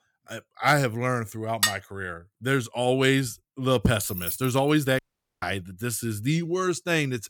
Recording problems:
clattering dishes; loud; at 1.5 s; peak 1 dB above the speech
jangling keys; noticeable; at 4 s; peak 5 dB below the speech
audio cutting out; at 5 s

